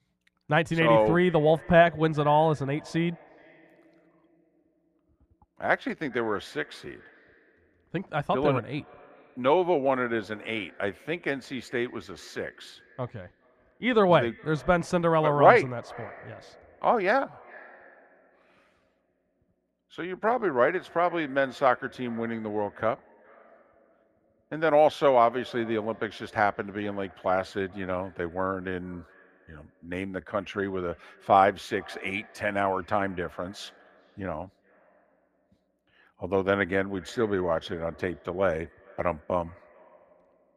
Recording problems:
muffled; very; fading above 3 kHz
echo of what is said; faint; throughout; 420 ms later, 25 dB below the speech

